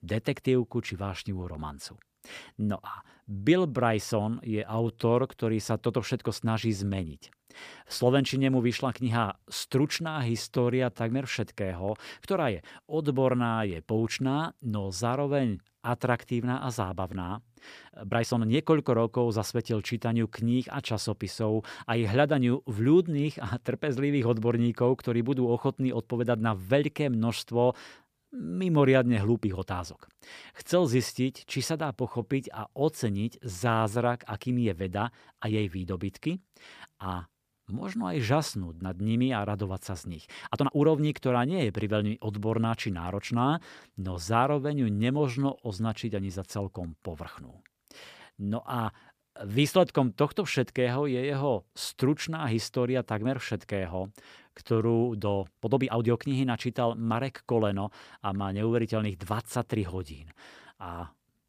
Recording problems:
uneven, jittery; strongly; from 4.5 s to 1:00

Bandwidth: 15 kHz